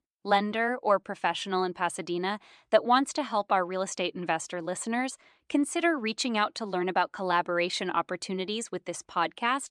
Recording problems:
none

